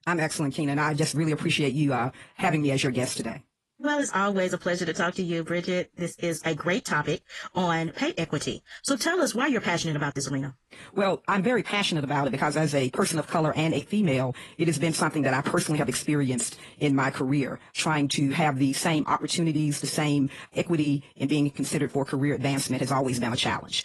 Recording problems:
wrong speed, natural pitch; too fast; 1.5 times normal speed
garbled, watery; slightly; nothing above 11.5 kHz

